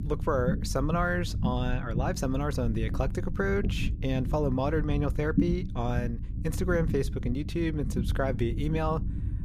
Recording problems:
low rumble; noticeable; throughout; 10 dB below the speech

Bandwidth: 14.5 kHz